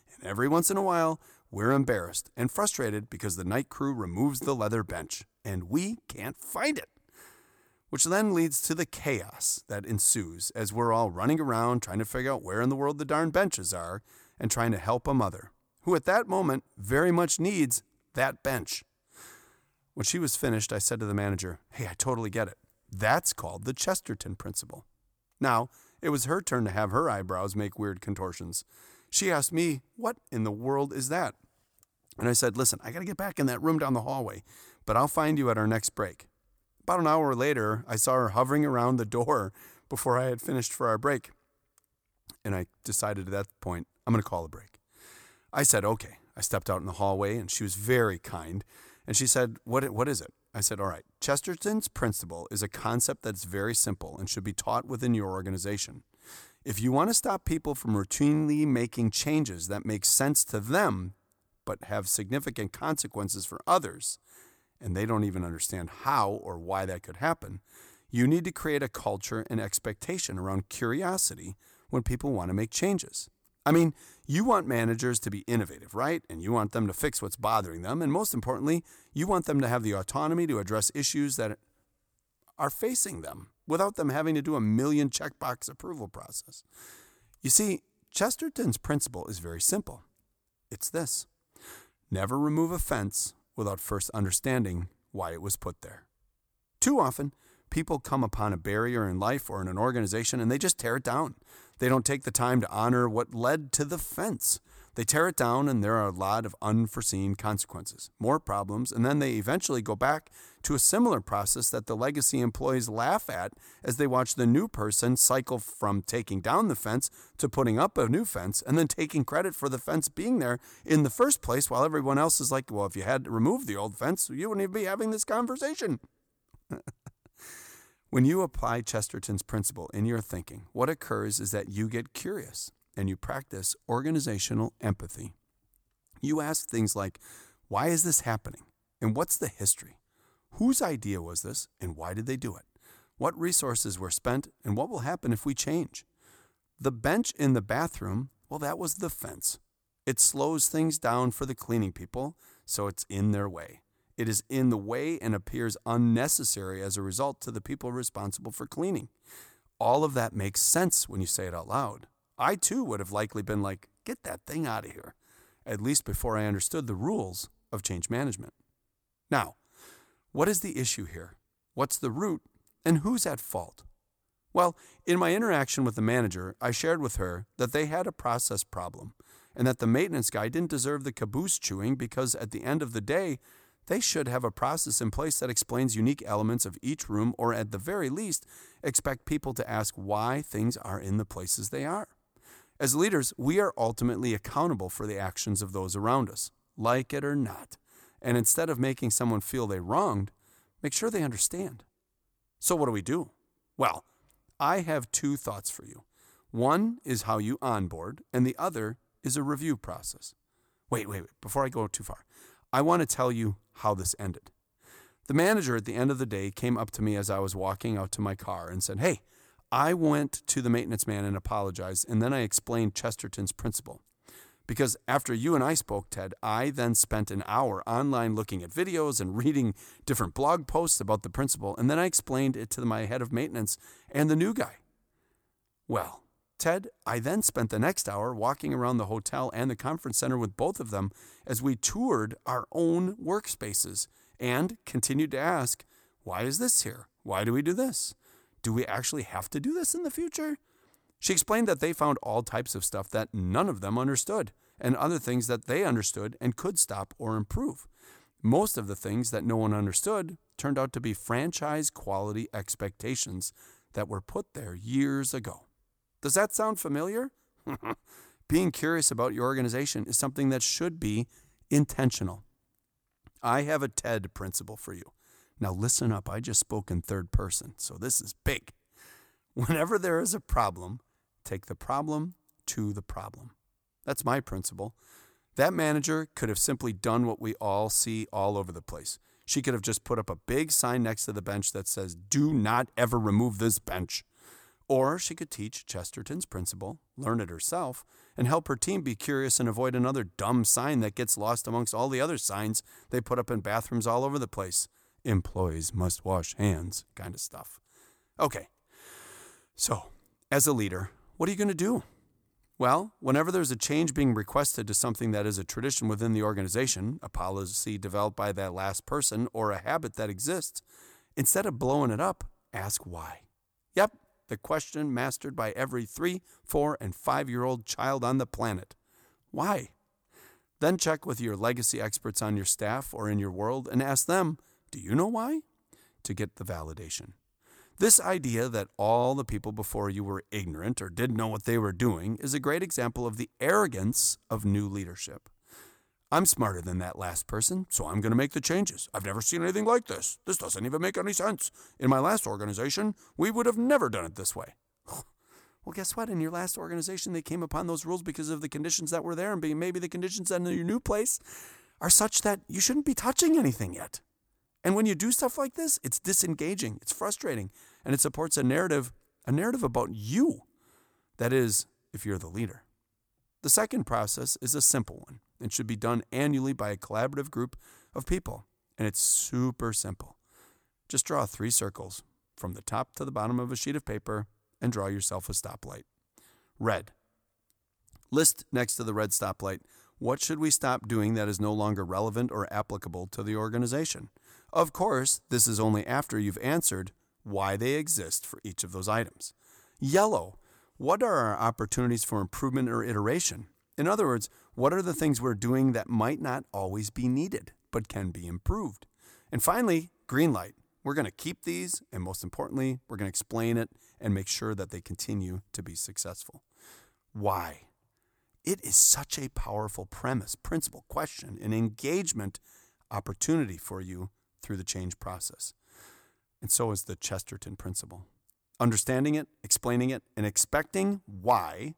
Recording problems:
none

